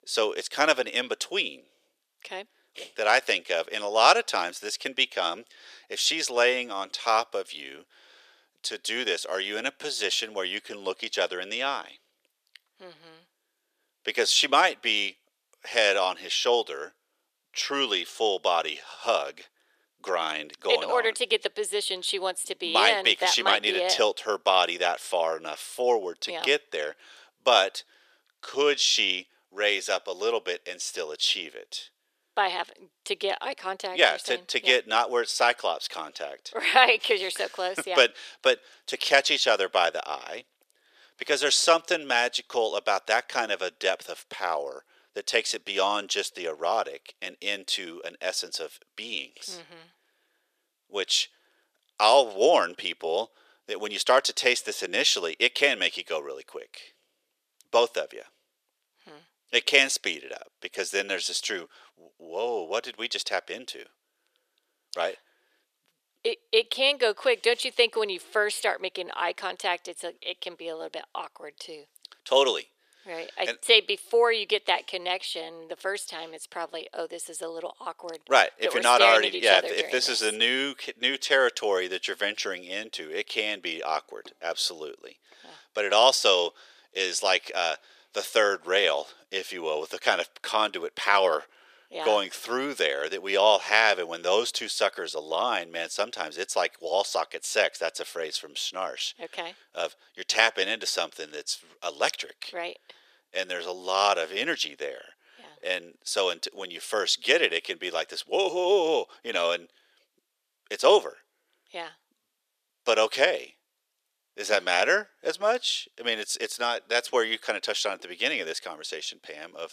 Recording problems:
thin; very; fading below 450 Hz

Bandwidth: 14.5 kHz